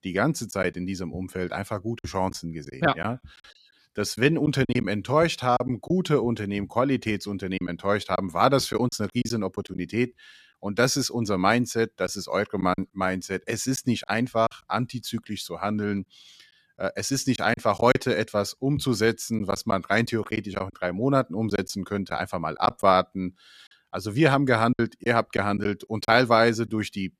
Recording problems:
choppy; very; 5% of the speech affected

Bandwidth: 14.5 kHz